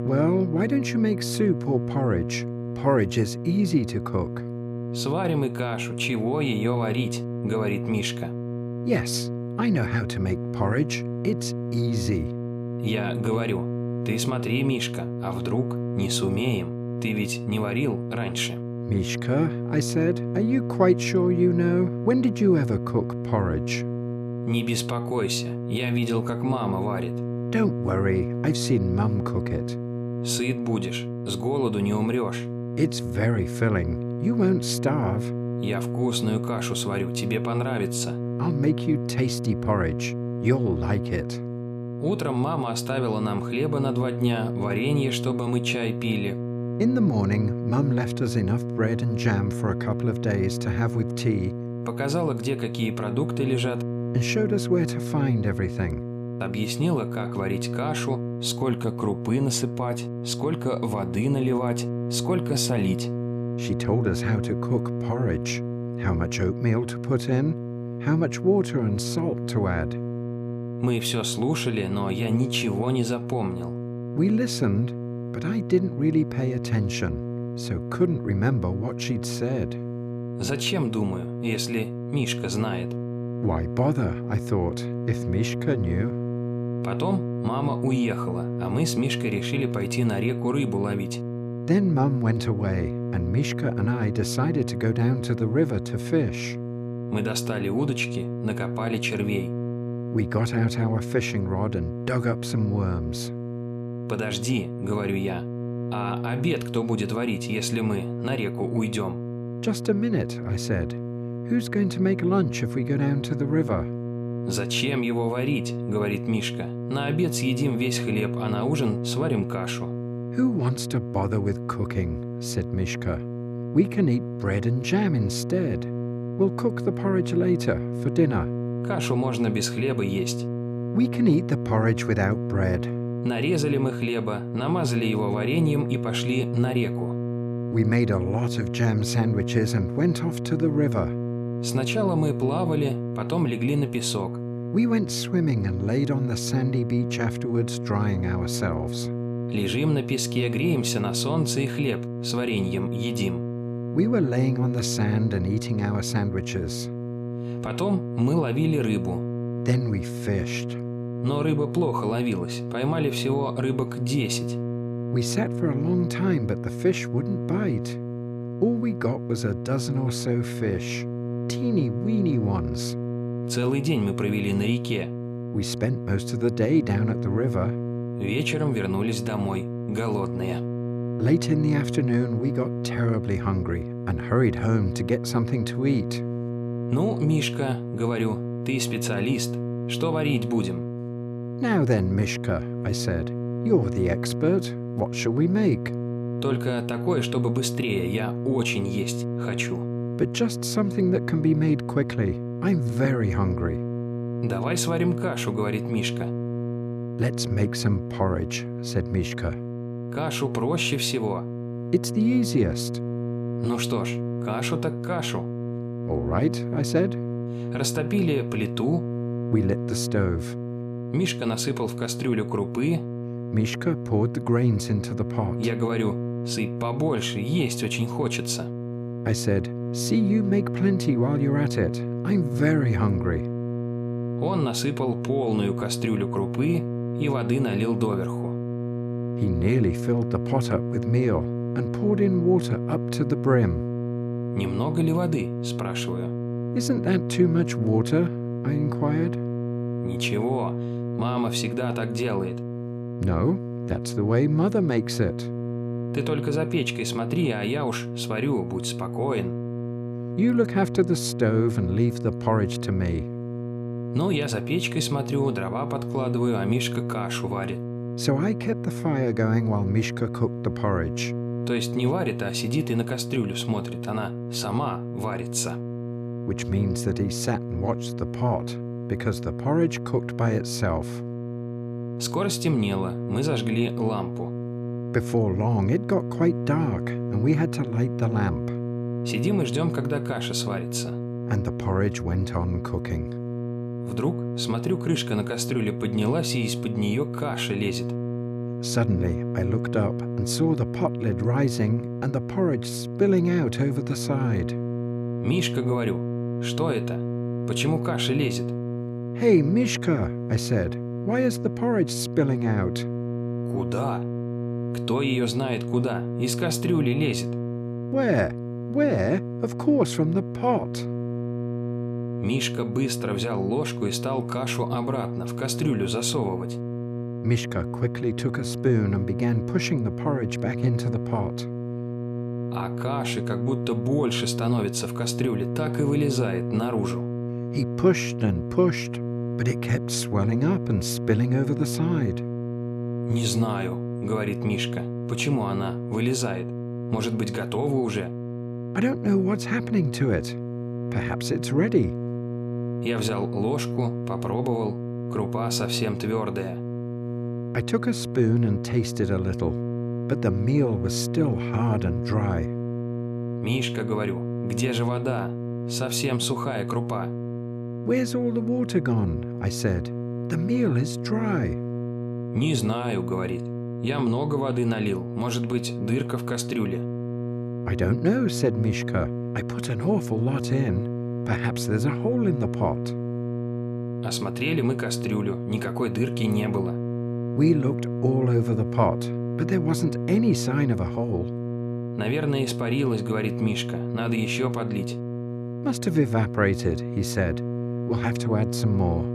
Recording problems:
electrical hum; loud; throughout; 60 Hz, 7 dB below the speech

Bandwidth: 14.5 kHz